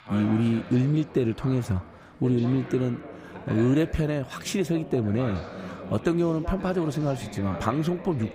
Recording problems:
background chatter; noticeable; throughout; 2 voices, 15 dB below the speech

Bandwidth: 15.5 kHz